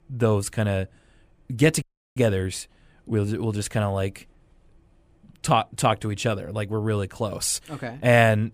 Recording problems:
audio cutting out; at 2 s

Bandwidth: 15 kHz